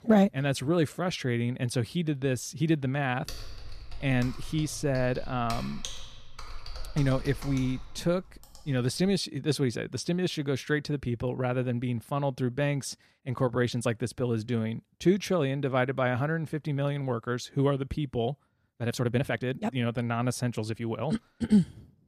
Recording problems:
keyboard typing; noticeable; from 3.5 to 9 s; peak 9 dB below the speech
uneven, jittery; strongly; from 13 to 21 s

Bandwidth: 14.5 kHz